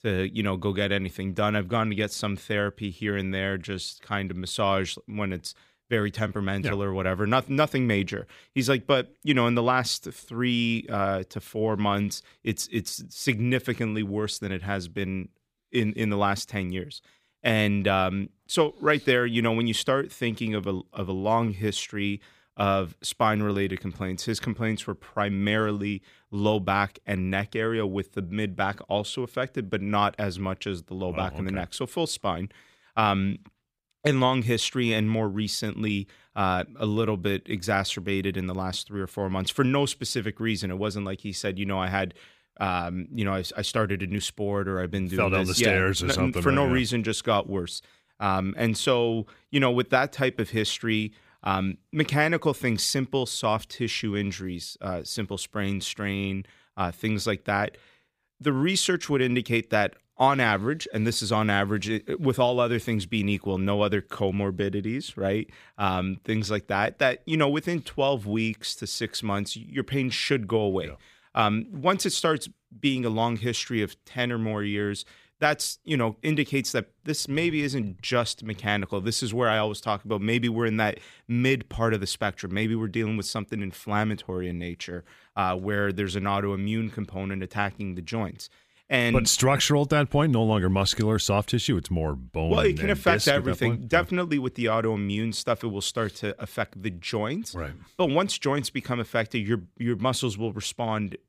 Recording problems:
none

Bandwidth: 15 kHz